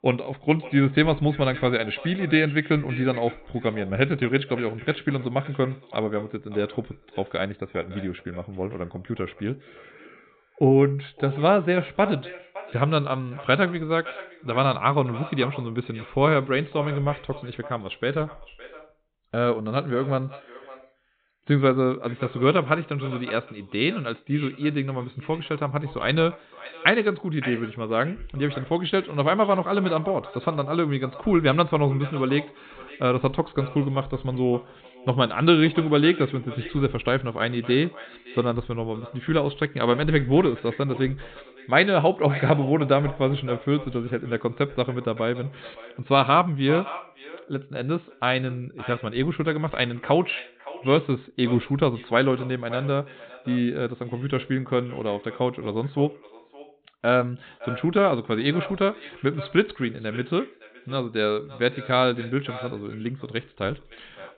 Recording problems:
high frequencies cut off; severe; nothing above 4 kHz
echo of what is said; noticeable; throughout; 560 ms later, 15 dB below the speech

